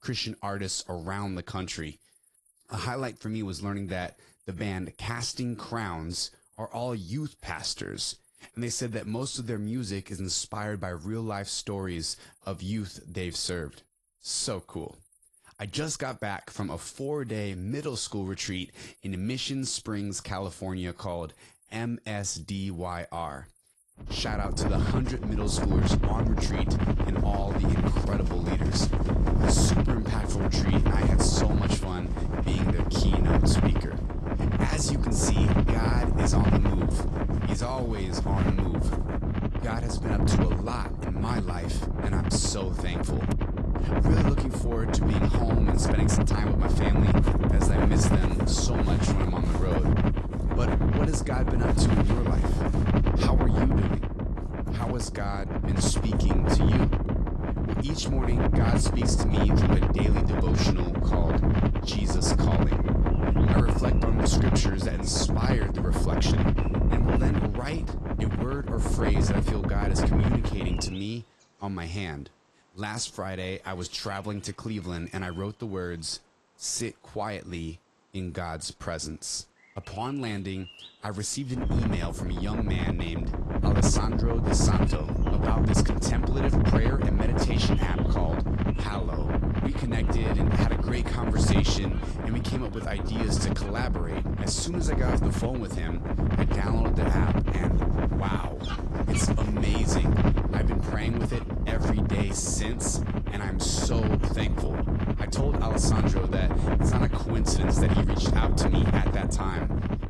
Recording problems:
garbled, watery; slightly
wind noise on the microphone; heavy; from 24 s to 1:11 and from 1:22 on; 2 dB above the speech
animal sounds; faint; throughout; 20 dB below the speech

